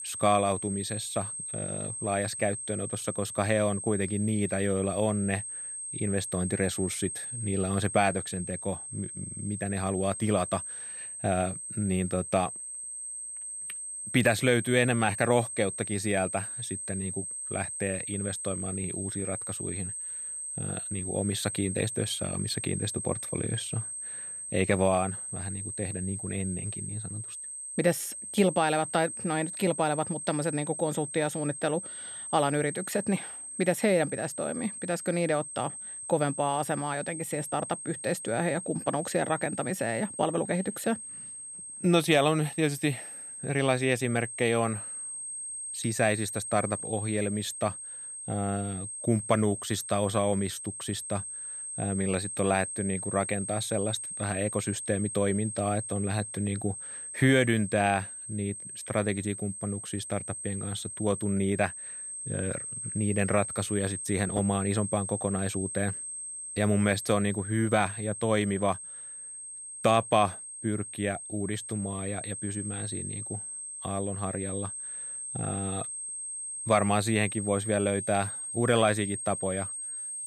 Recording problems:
high-pitched whine; loud; throughout; 8.5 kHz, 6 dB below the speech

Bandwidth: 14.5 kHz